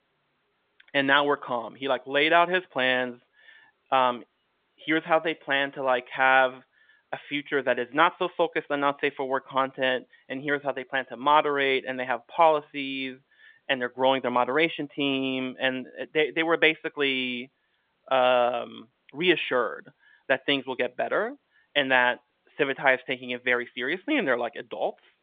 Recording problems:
phone-call audio

